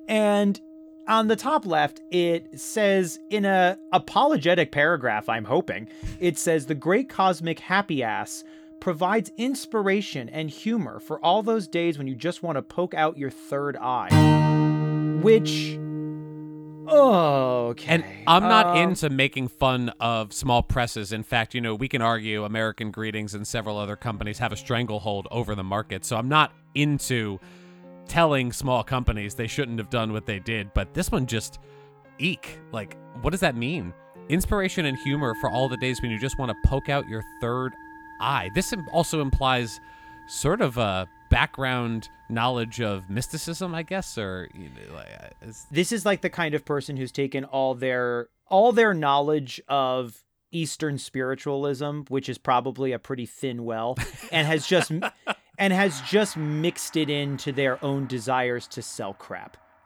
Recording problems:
background music; loud; throughout; 7 dB below the speech

